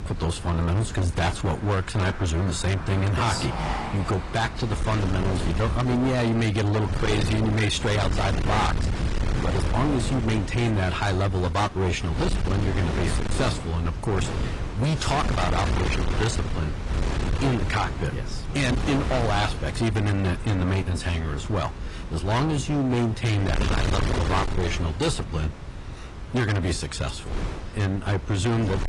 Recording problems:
distortion; heavy; 30% of the sound clipped
garbled, watery; slightly; nothing above 10 kHz
wind noise on the microphone; heavy; 7 dB below the speech
traffic noise; noticeable; throughout; 15 dB below the speech

